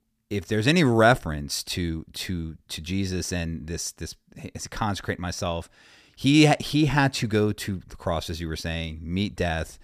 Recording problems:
none

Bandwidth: 15 kHz